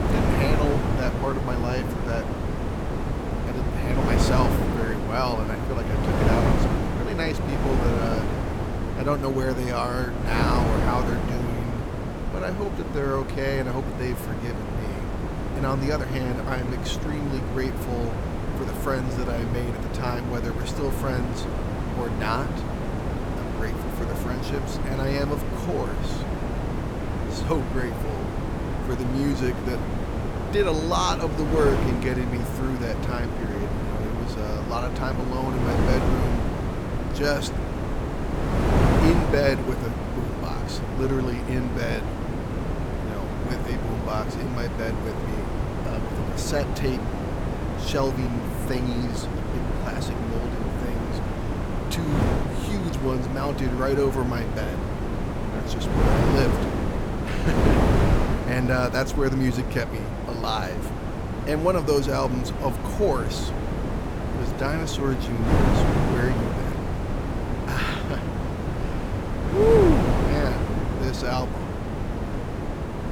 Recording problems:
wind noise on the microphone; heavy; 2 dB below the speech

